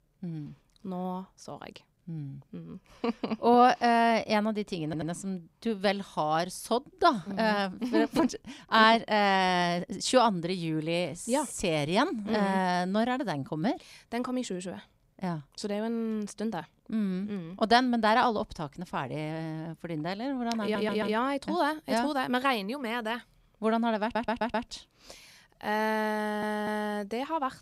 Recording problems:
audio stuttering; 4 times, first at 5 s

